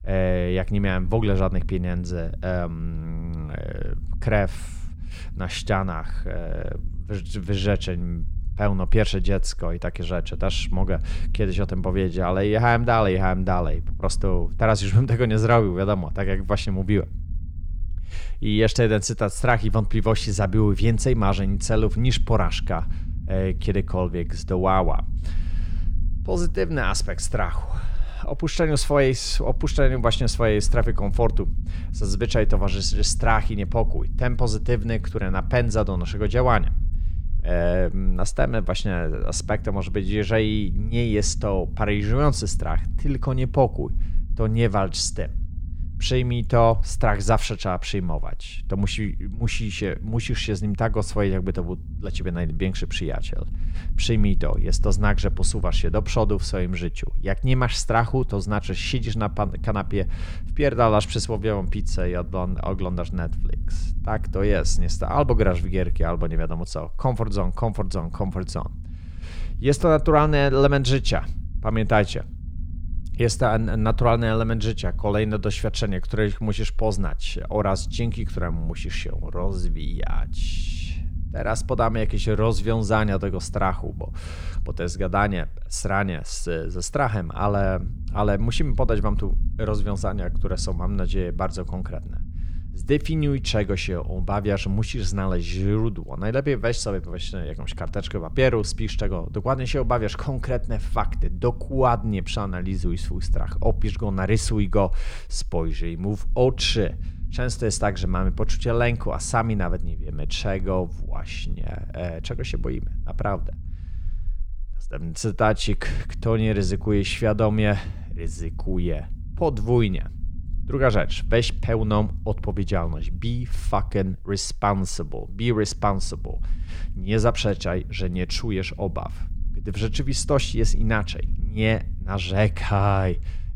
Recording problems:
low rumble; faint; throughout; 25 dB below the speech

